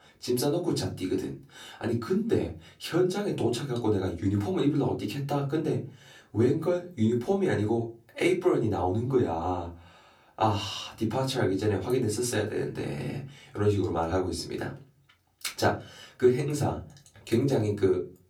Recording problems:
off-mic speech; far
room echo; very slight; dies away in 0.3 s

